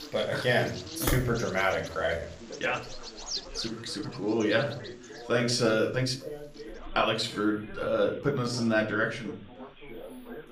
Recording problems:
room echo; slight; dies away in 0.4 s
off-mic speech; somewhat distant
animal sounds; noticeable; throughout; 15 dB below the speech
background chatter; noticeable; throughout; 2 voices, 20 dB below the speech
uneven, jittery; strongly; from 1 to 9 s

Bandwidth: 15 kHz